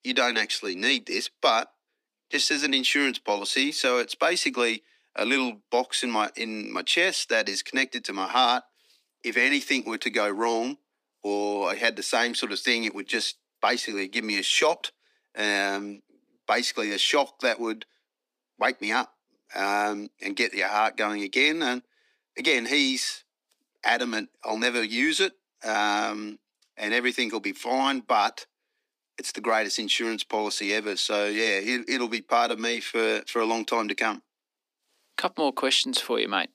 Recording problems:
thin; somewhat; fading below 250 Hz

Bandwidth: 15 kHz